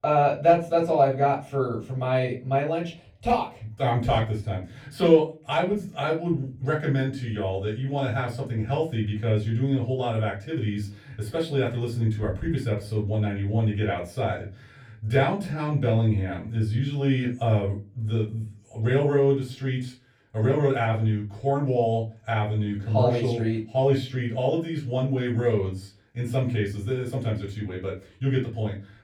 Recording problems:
off-mic speech; far
room echo; slight; dies away in 0.3 s

